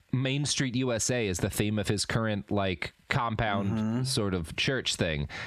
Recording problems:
squashed, flat; heavily

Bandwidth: 14.5 kHz